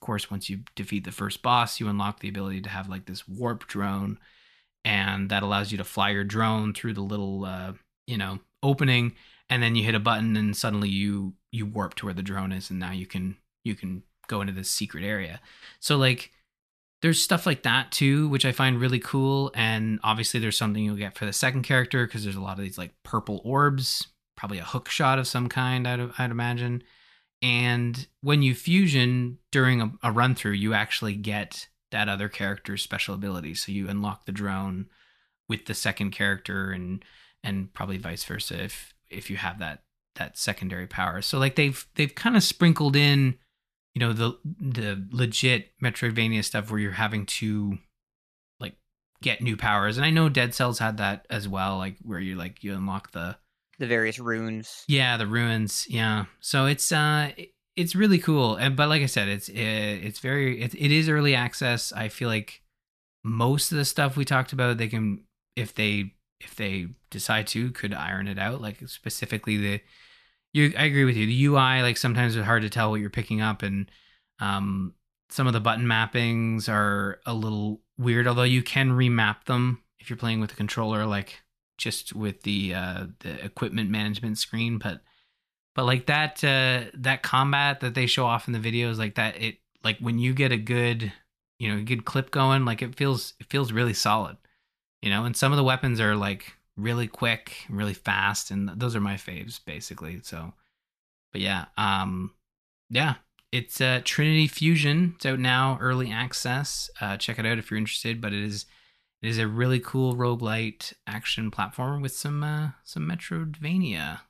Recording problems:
none

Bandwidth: 14.5 kHz